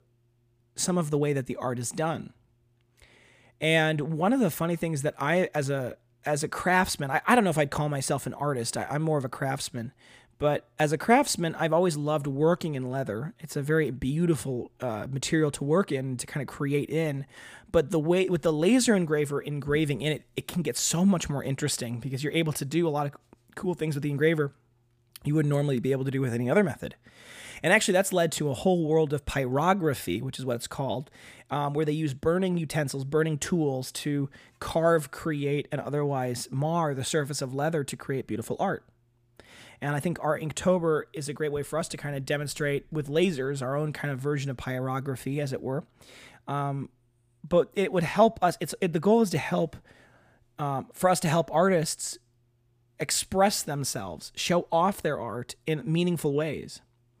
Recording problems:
none

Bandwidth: 15 kHz